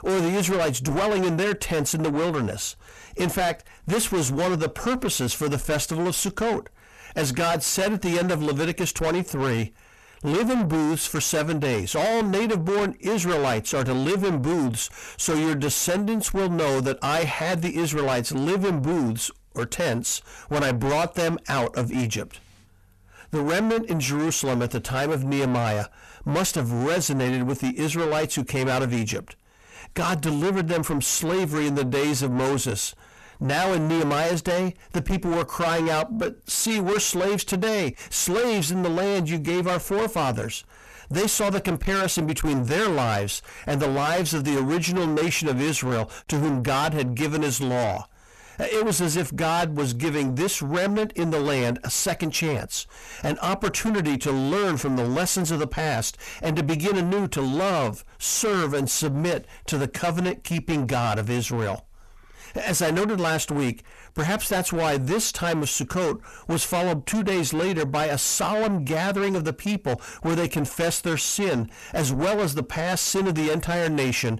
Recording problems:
distortion; heavy; 6 dB below the speech

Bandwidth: 13.5 kHz